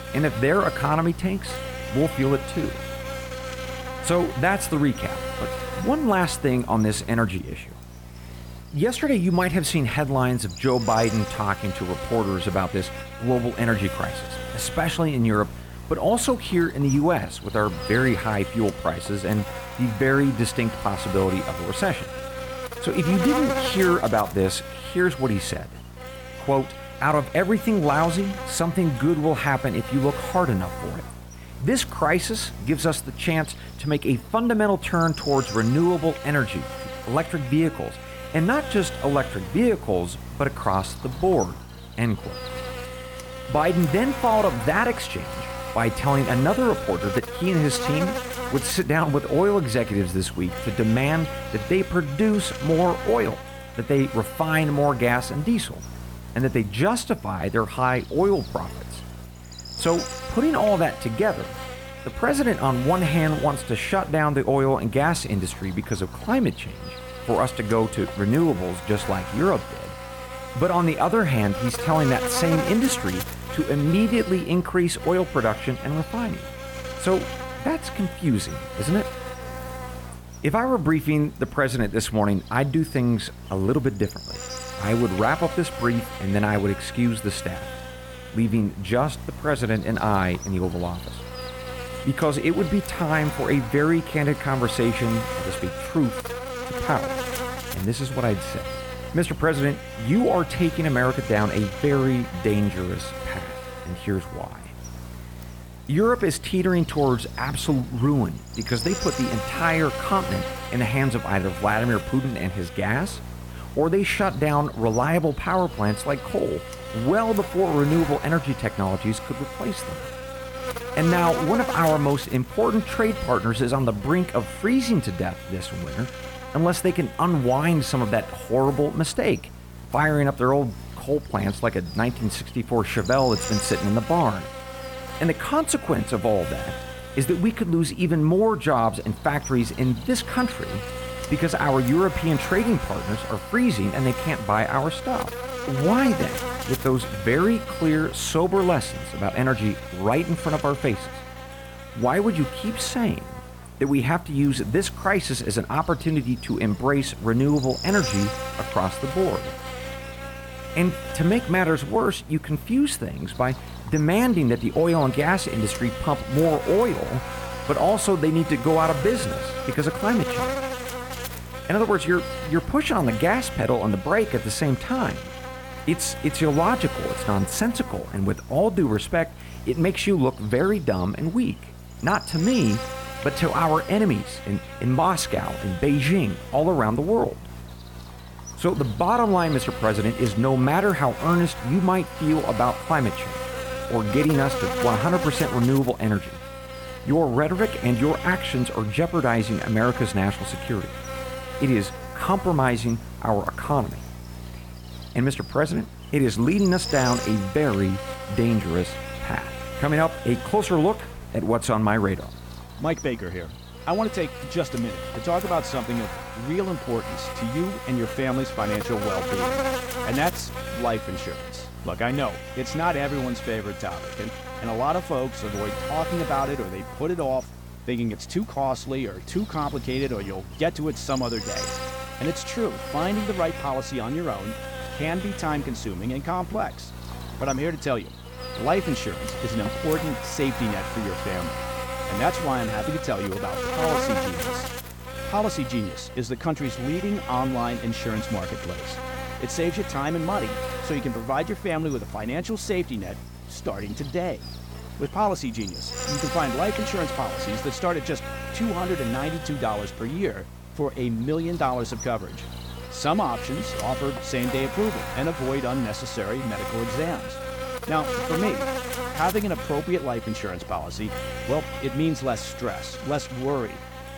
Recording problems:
electrical hum; loud; throughout; 60 Hz, 8 dB below the speech

